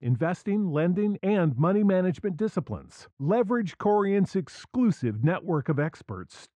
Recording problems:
muffled; very; fading above 1.5 kHz

